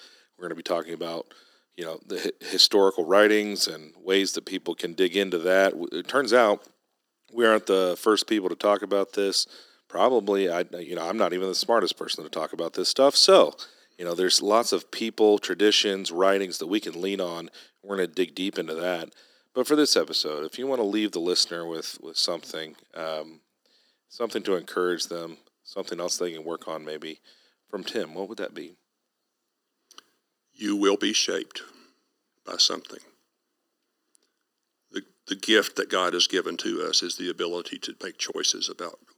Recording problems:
thin; very; fading below 300 Hz

